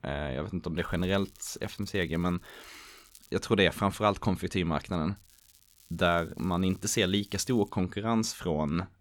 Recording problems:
crackling; faint; from 1 to 3.5 s and from 5 to 7.5 s; 25 dB below the speech

